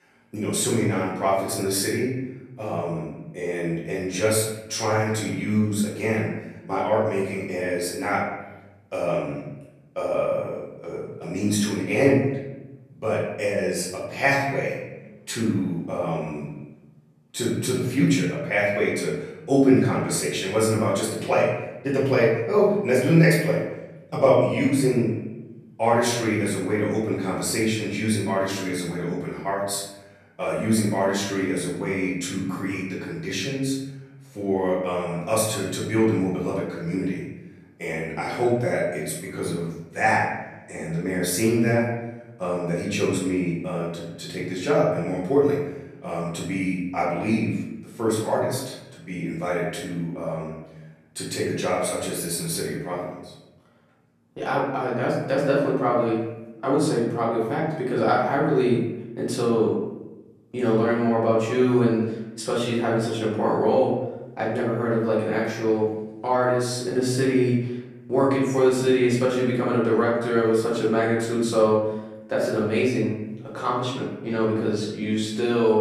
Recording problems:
off-mic speech; far
room echo; noticeable; dies away in 0.9 s

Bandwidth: 14 kHz